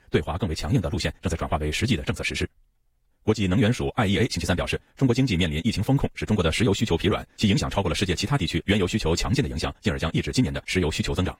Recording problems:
wrong speed, natural pitch; too fast; 1.7 times normal speed
garbled, watery; slightly; nothing above 15.5 kHz

